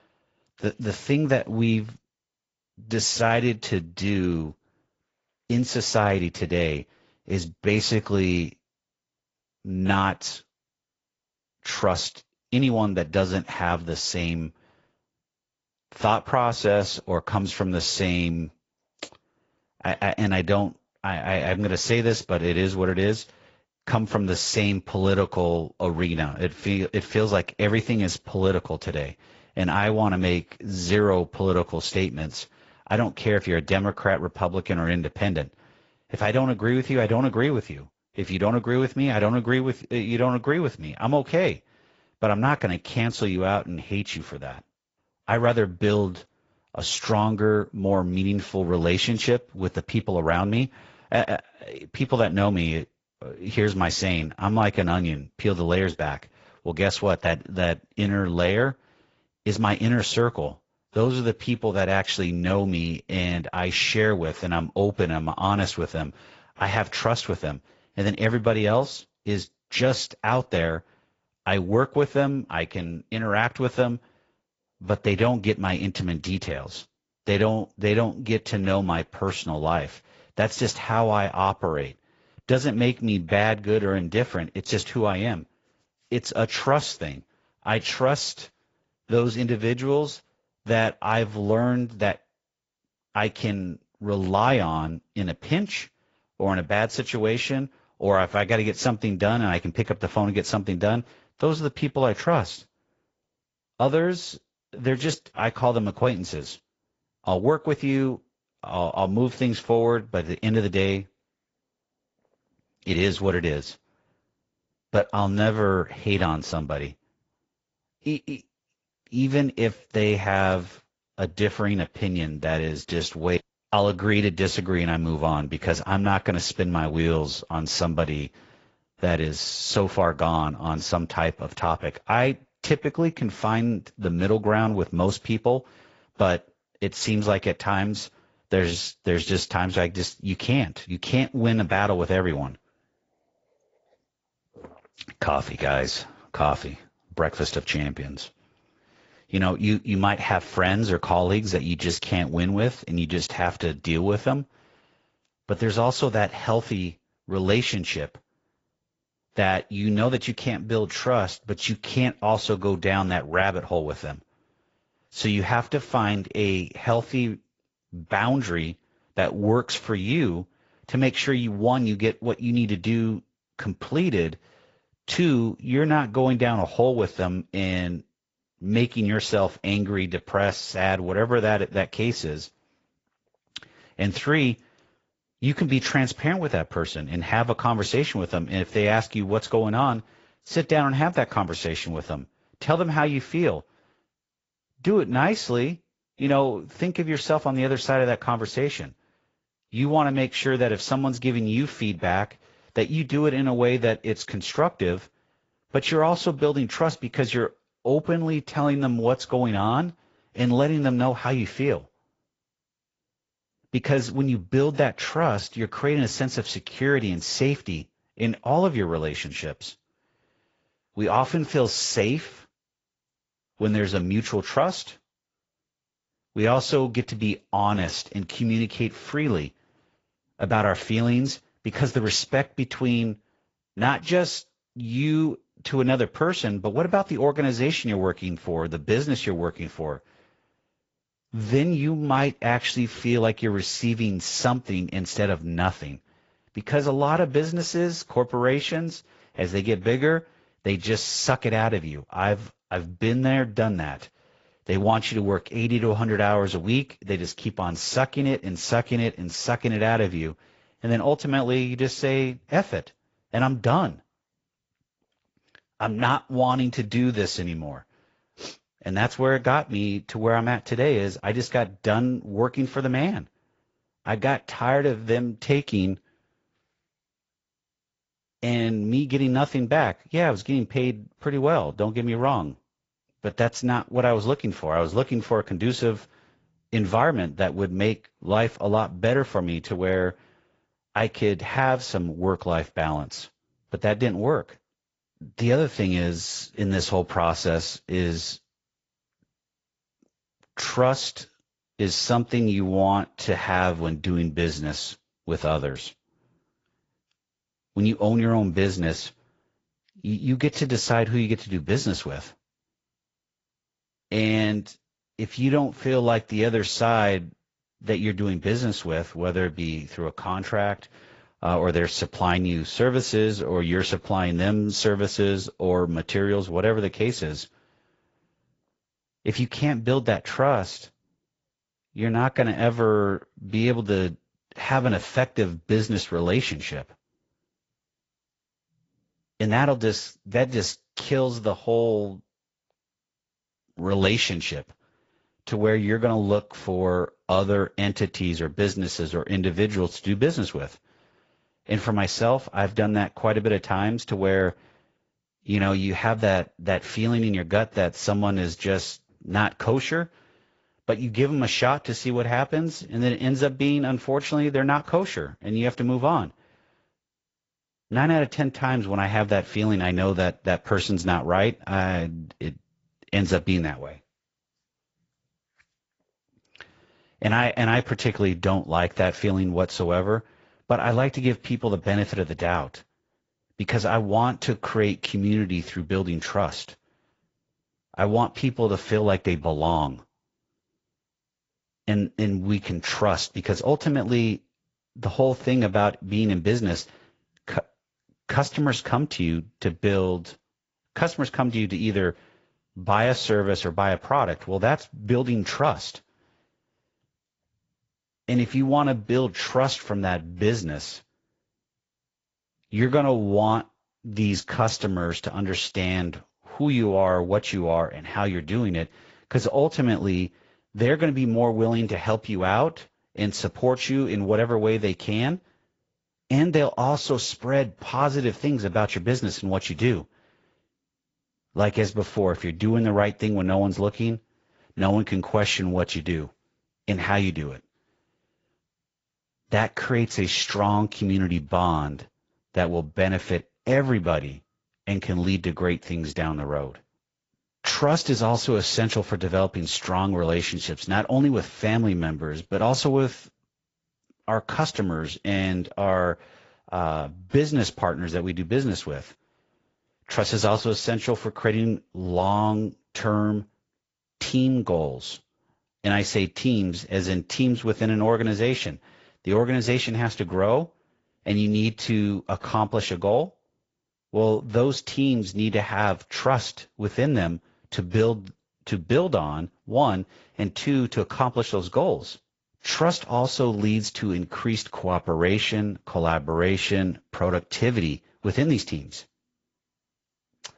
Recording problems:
garbled, watery; slightly; nothing above 7.5 kHz
high frequencies cut off; slight

